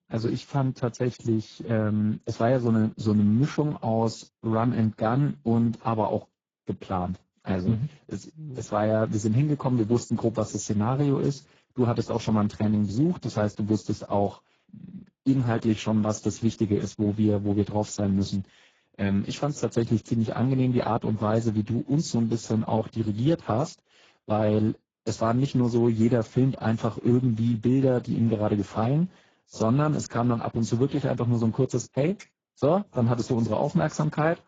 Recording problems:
garbled, watery; badly; nothing above 7.5 kHz

